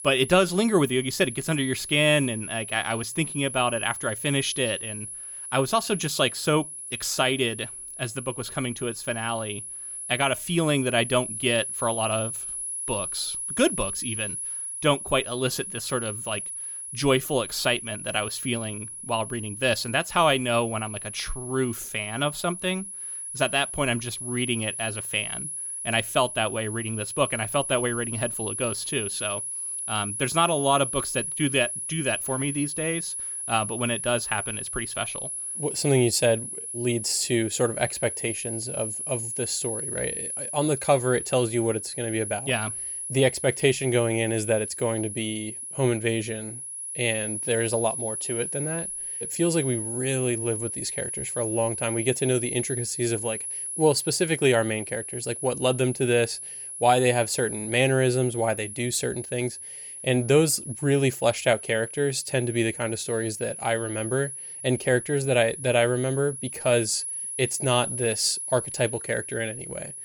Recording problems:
high-pitched whine; loud; throughout; 10.5 kHz, 6 dB below the speech

